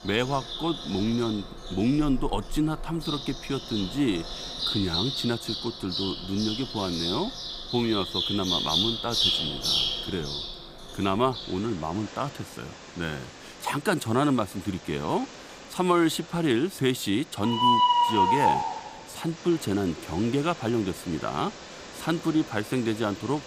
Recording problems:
animal sounds; very loud; throughout; 1 dB above the speech

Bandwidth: 15 kHz